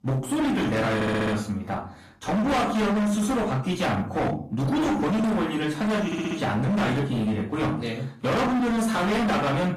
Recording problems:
distortion; heavy; 33% of the sound clipped
off-mic speech; far
room echo; slight; dies away in 0.4 s
garbled, watery; slightly; nothing above 14.5 kHz
audio stuttering; at 1 s and at 6 s

